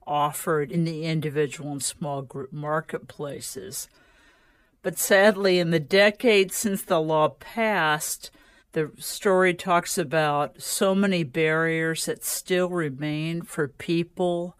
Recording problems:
wrong speed, natural pitch; too slow; 0.6 times normal speed

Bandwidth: 15 kHz